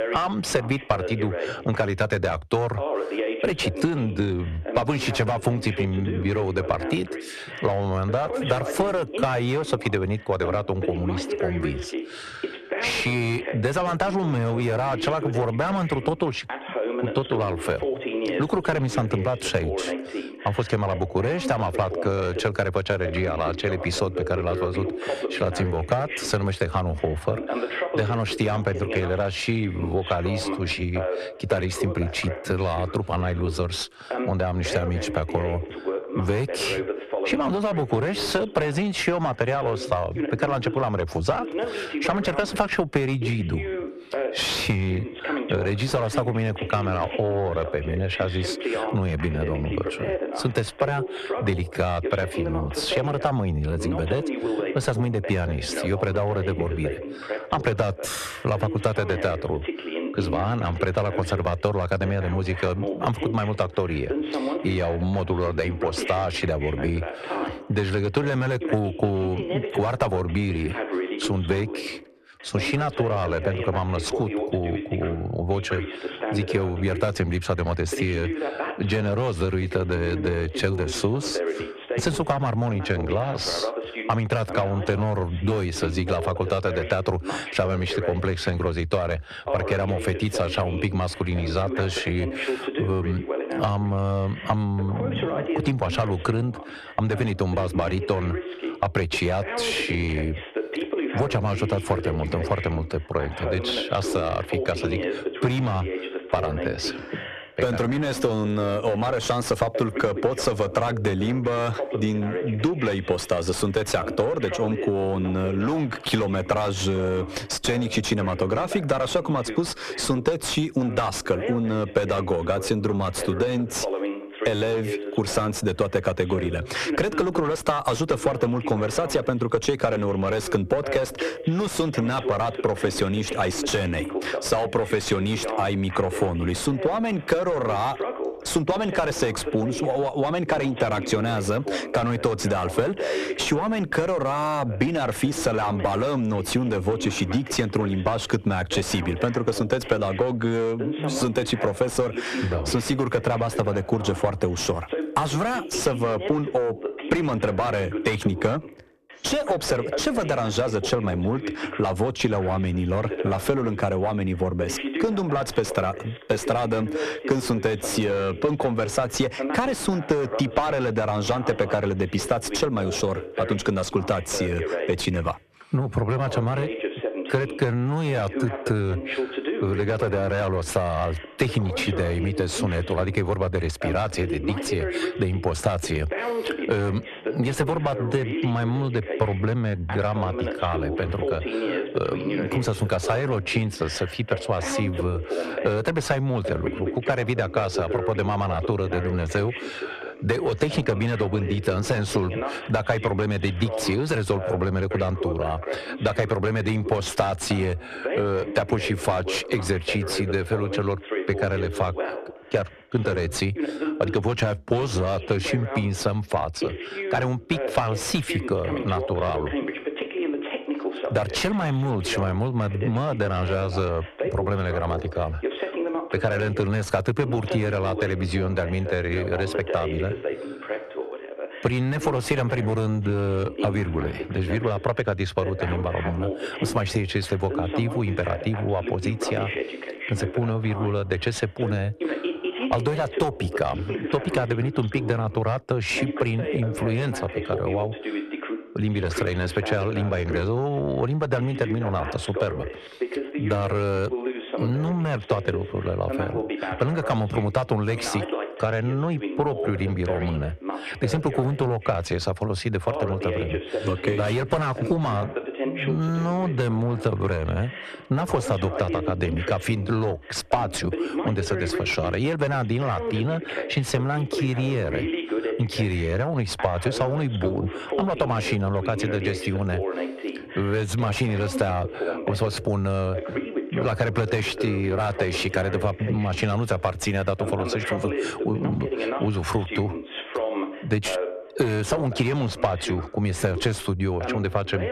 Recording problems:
distortion; heavy; 7 dB below the speech
squashed, flat; somewhat, background pumping
voice in the background; loud; throughout; 7 dB below the speech

